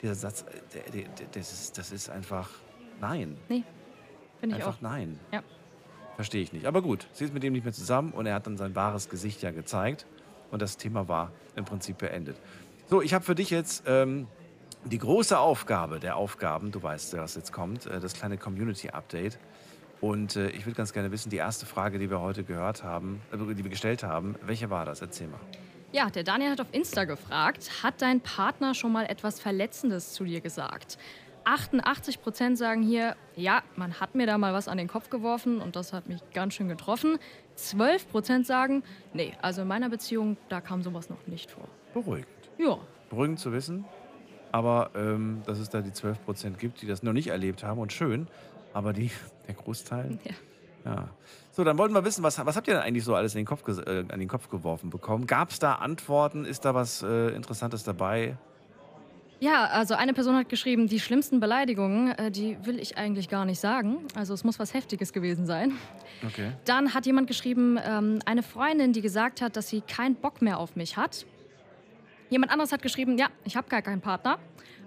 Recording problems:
murmuring crowd; faint; throughout; 25 dB below the speech

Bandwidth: 15 kHz